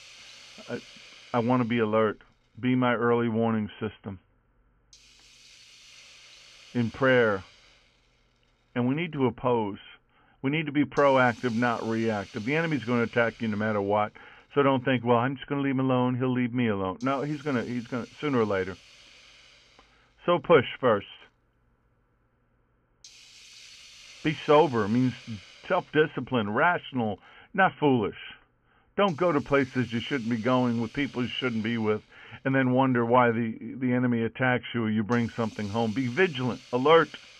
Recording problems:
high frequencies cut off; severe; nothing above 3 kHz
hiss; faint; throughout; 25 dB below the speech

